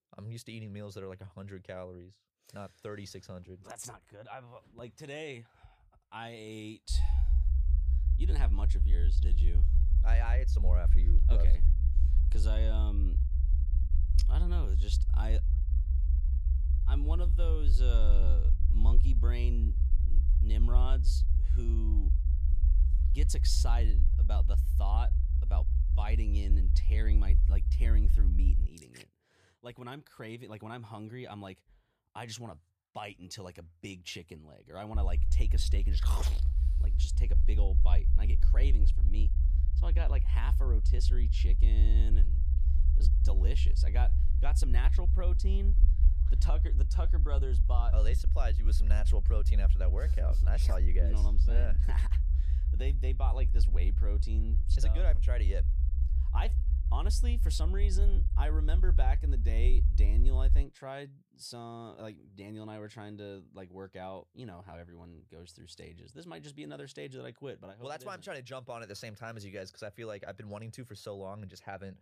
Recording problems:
low rumble; loud; from 7 to 29 s and from 35 s to 1:01; 6 dB below the speech

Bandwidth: 14.5 kHz